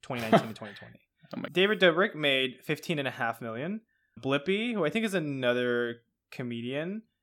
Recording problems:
none

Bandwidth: 17 kHz